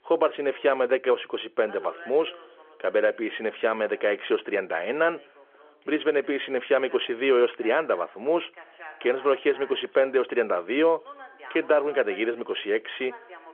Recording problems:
phone-call audio; nothing above 3.5 kHz
voice in the background; faint; throughout; 20 dB below the speech

